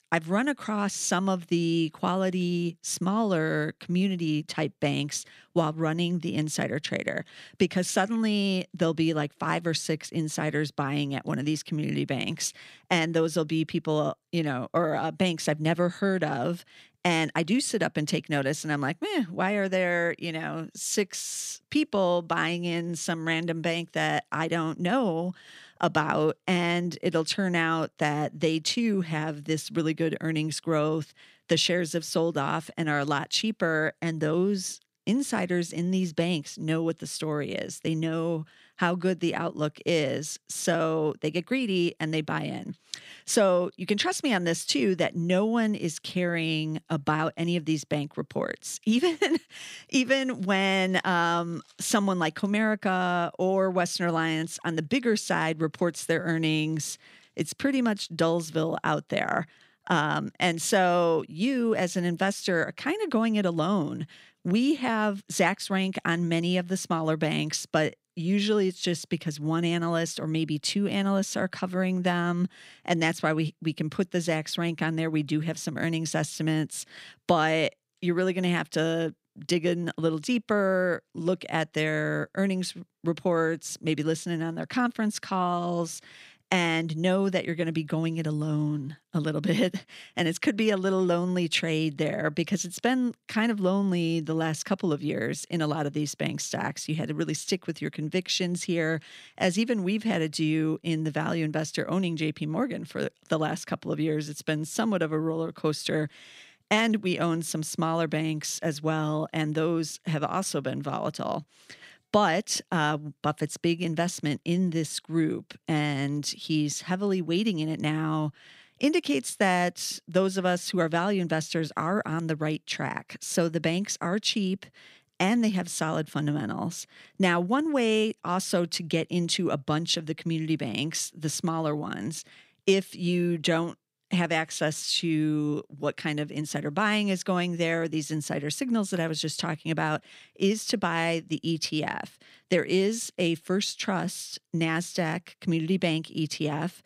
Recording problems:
none

